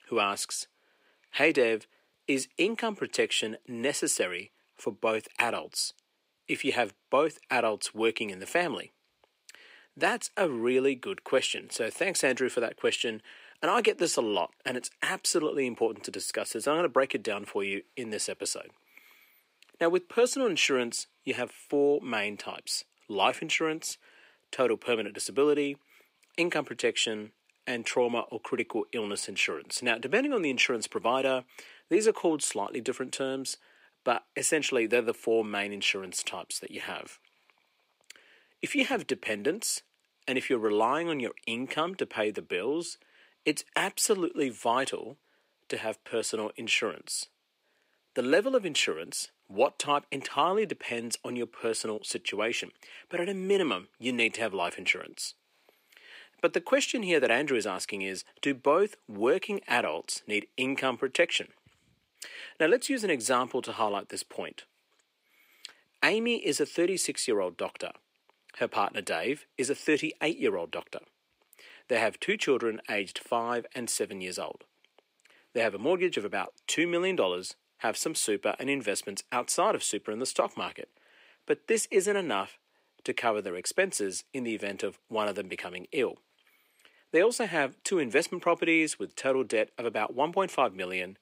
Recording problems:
thin; somewhat; fading below 450 Hz

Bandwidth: 15.5 kHz